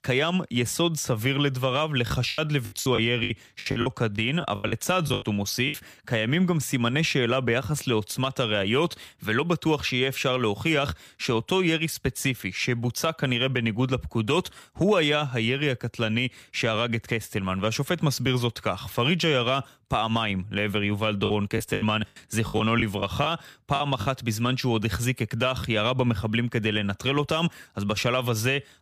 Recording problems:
choppy; very; from 2 to 5.5 s and from 21 to 24 s; 15% of the speech affected

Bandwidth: 15 kHz